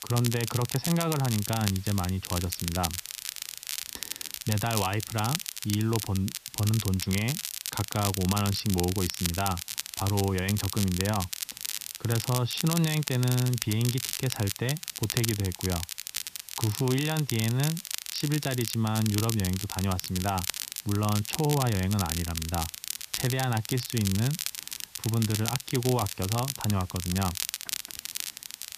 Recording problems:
high frequencies cut off; noticeable; nothing above 6 kHz
crackle, like an old record; loud; 4 dB below the speech
hiss; faint; throughout; 20 dB below the speech

